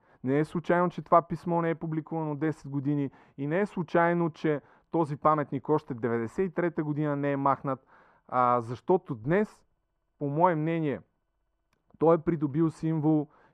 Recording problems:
muffled; very; fading above 2.5 kHz

